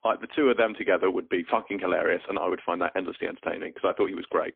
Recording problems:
phone-call audio; poor line; nothing above 3.5 kHz

